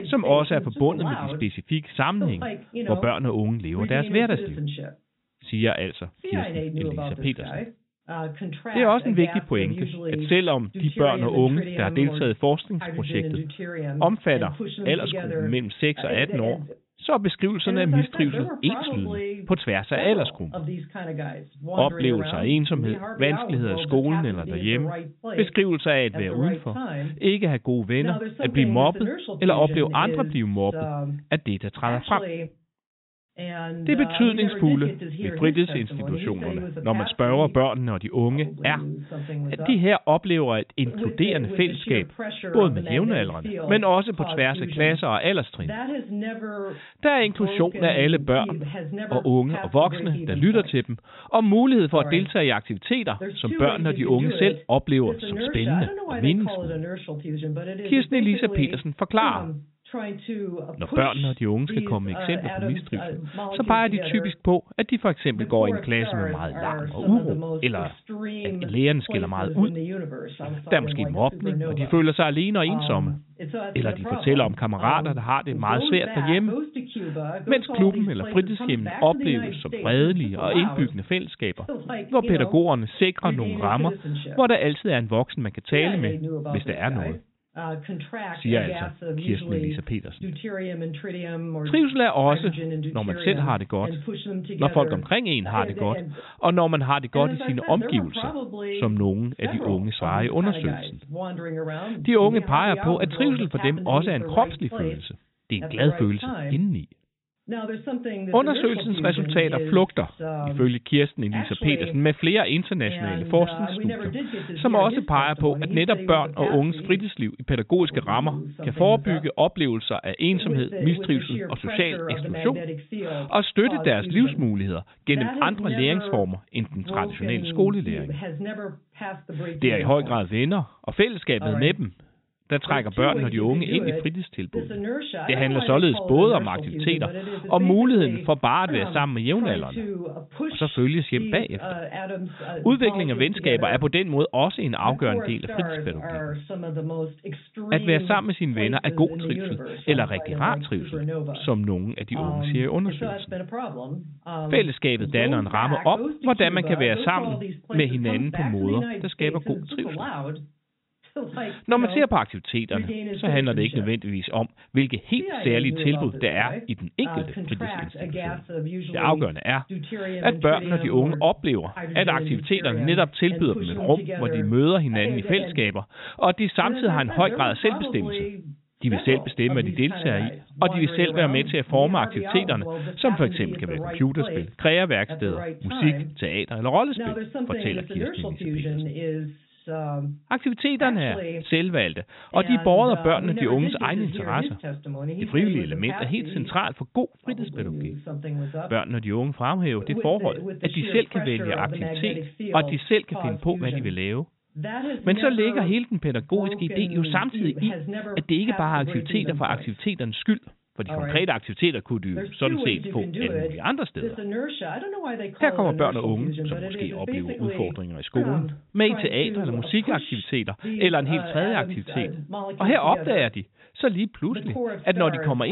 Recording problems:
high frequencies cut off; severe; nothing above 4 kHz
voice in the background; loud; throughout; 8 dB below the speech
abrupt cut into speech; at the end

